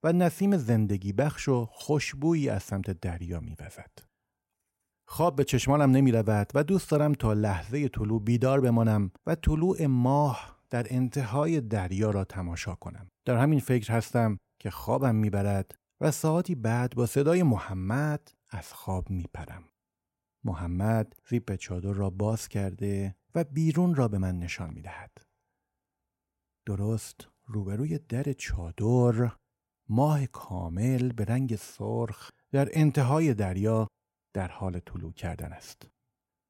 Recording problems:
none

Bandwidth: 16 kHz